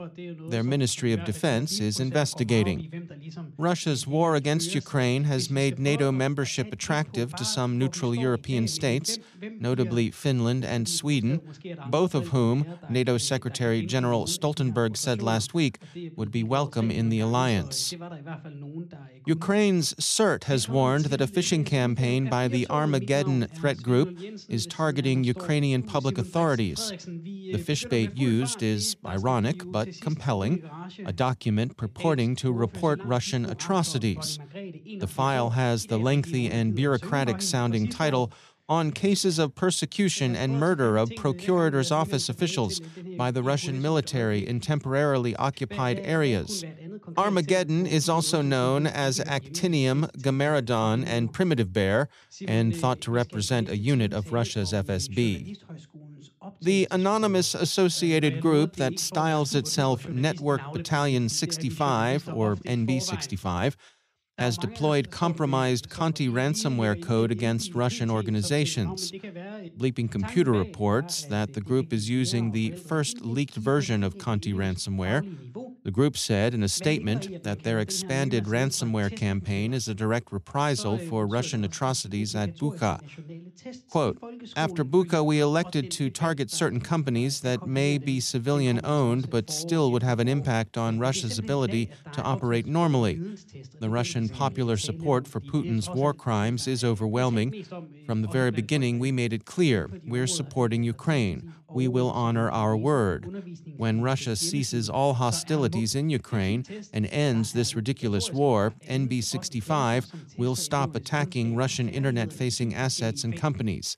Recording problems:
voice in the background; noticeable; throughout; 15 dB below the speech

